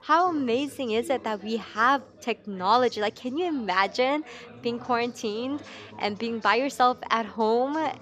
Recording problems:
background chatter; faint; throughout; 3 voices, 20 dB below the speech

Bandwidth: 14.5 kHz